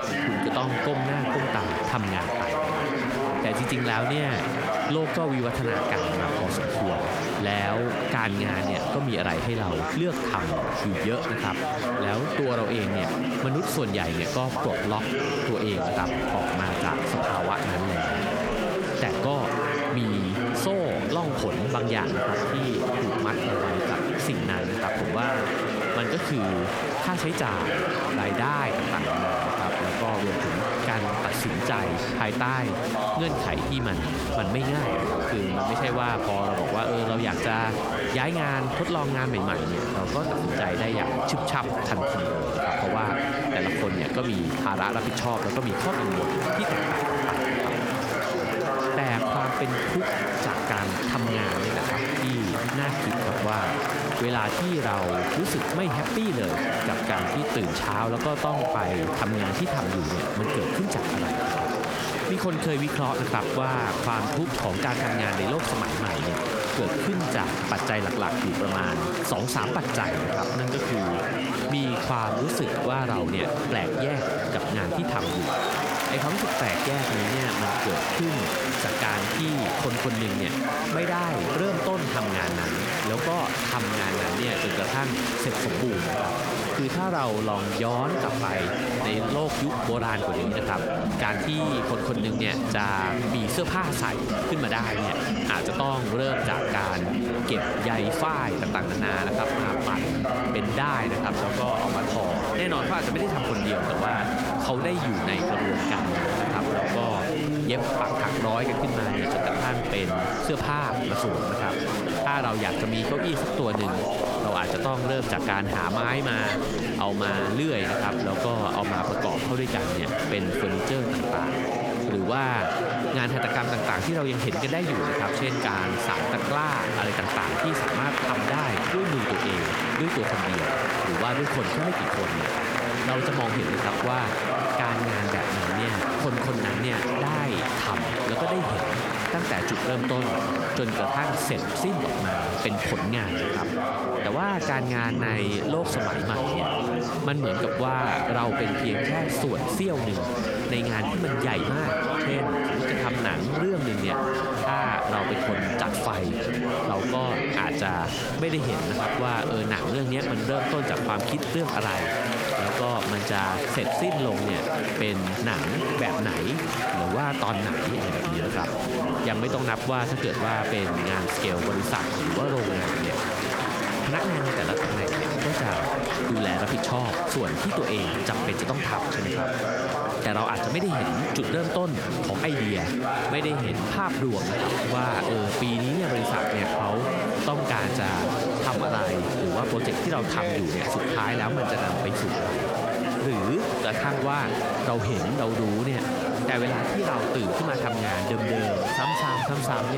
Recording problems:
squashed, flat; somewhat
chatter from many people; very loud; throughout; 1 dB above the speech
abrupt cut into speech; at the end

